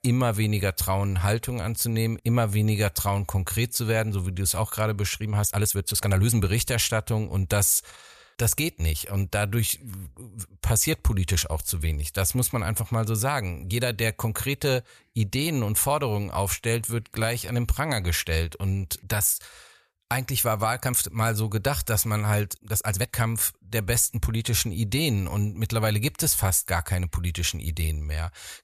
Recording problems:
uneven, jittery; strongly; from 5 to 23 s

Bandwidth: 14.5 kHz